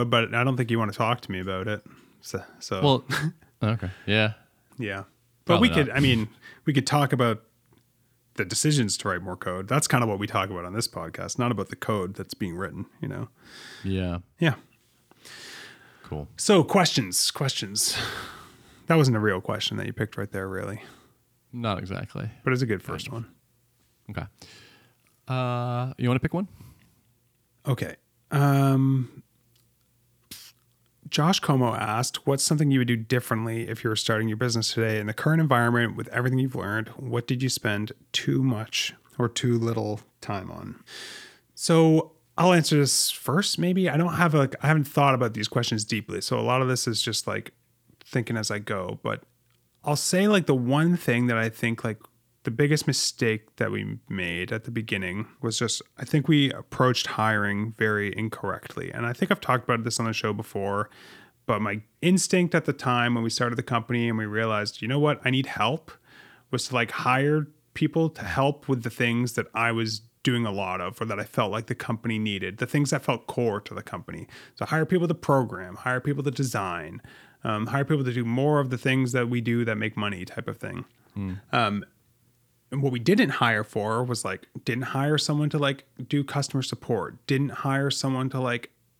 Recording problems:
abrupt cut into speech; at the start

